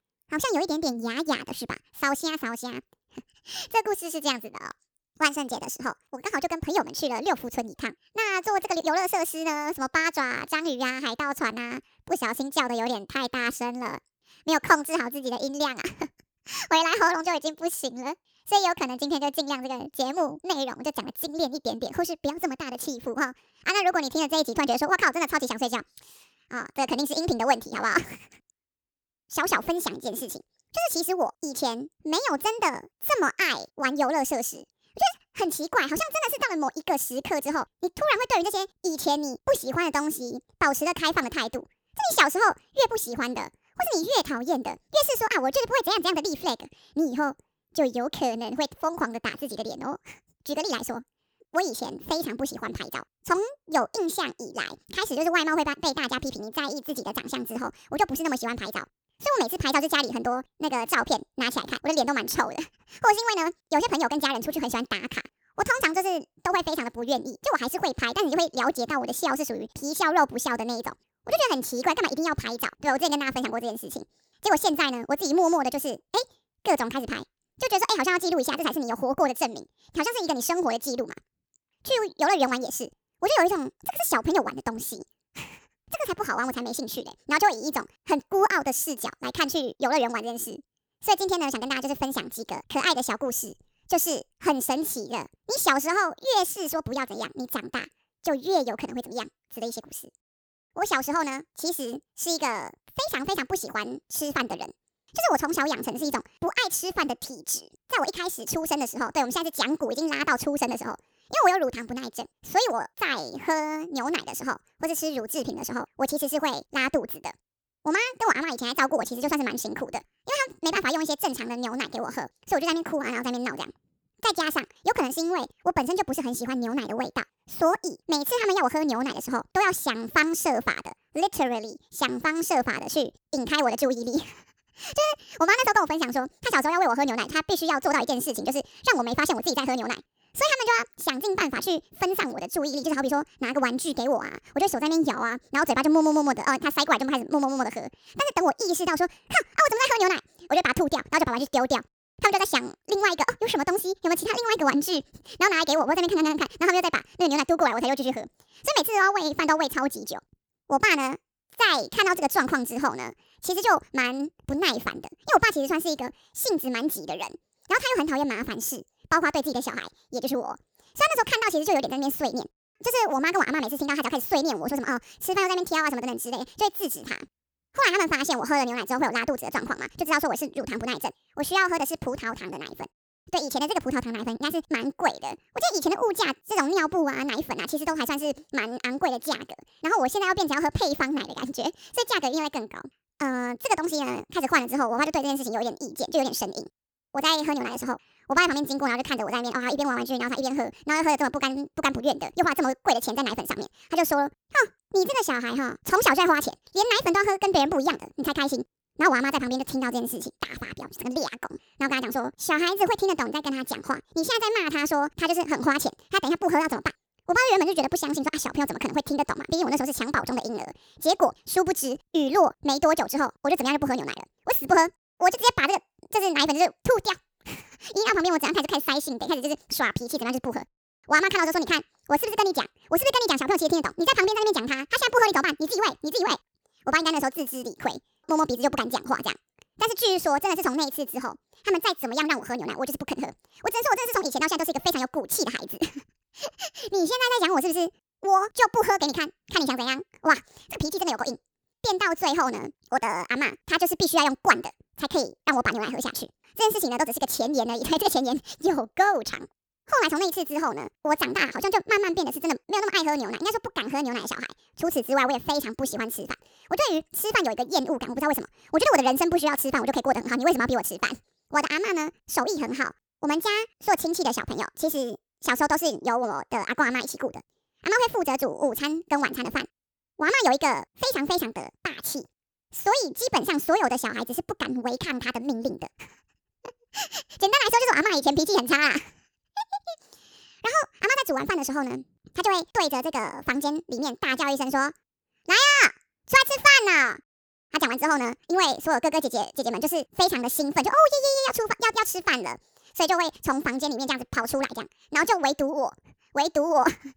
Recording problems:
wrong speed and pitch; too fast and too high; 1.5 times normal speed

